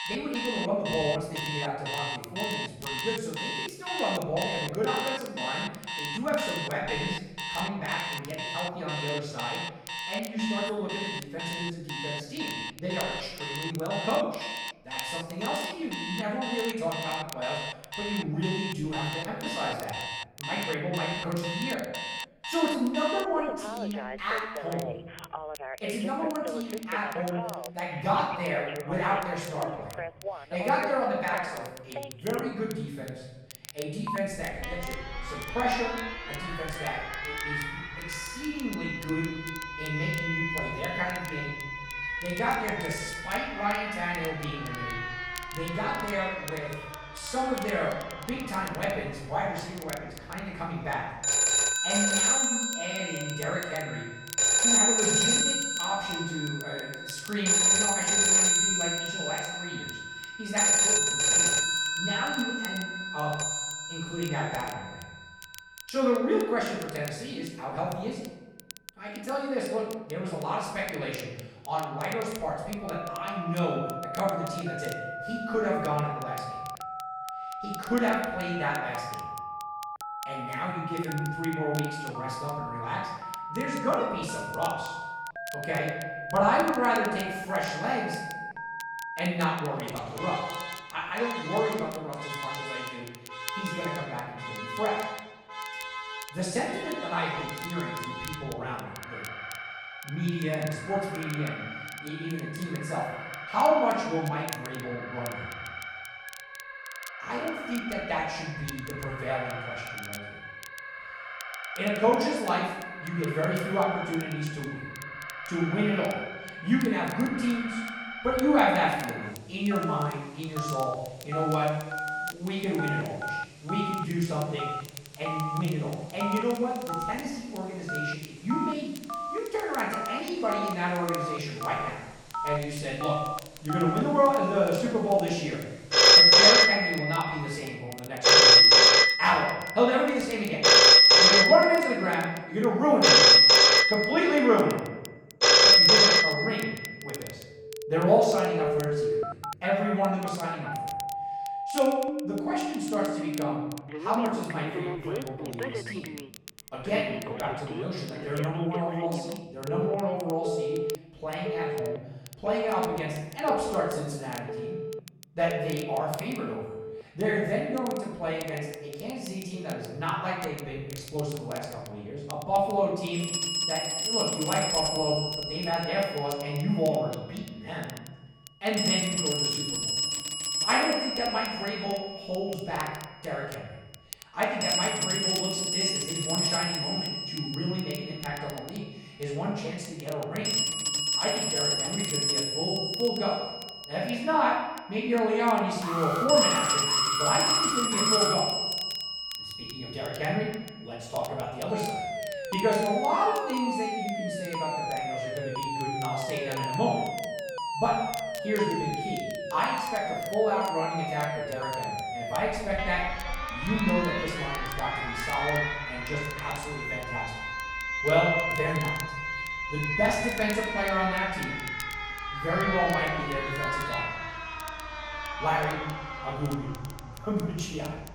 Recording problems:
off-mic speech; far
room echo; noticeable; dies away in 0.9 s
alarms or sirens; very loud; throughout; 4 dB above the speech
crackle, like an old record; noticeable; 15 dB below the speech
alarm; loud; from 3:16 to 3:18; peak 1 dB above the speech

